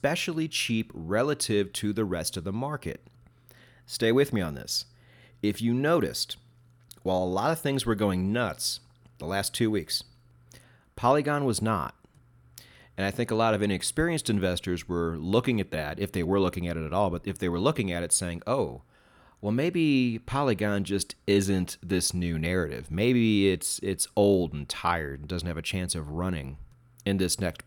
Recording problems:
none

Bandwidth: 18.5 kHz